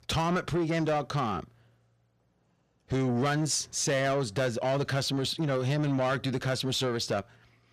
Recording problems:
distortion; slight; 10 dB below the speech

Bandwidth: 15 kHz